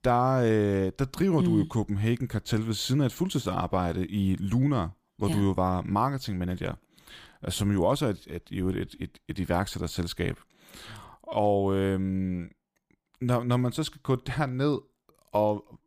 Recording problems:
none

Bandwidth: 15 kHz